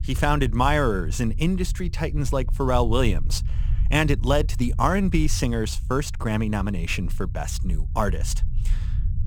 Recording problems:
low rumble; faint; throughout; 20 dB below the speech

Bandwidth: 18.5 kHz